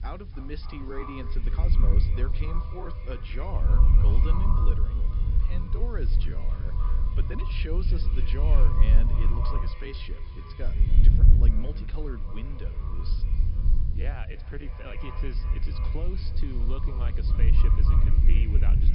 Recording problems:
echo of what is said; strong; throughout; 280 ms later, 6 dB below the speech
high frequencies cut off; noticeable; nothing above 5.5 kHz
low rumble; loud; throughout; 3 dB below the speech
hiss; faint; throughout; 25 dB below the speech
uneven, jittery; strongly; from 0.5 to 18 s

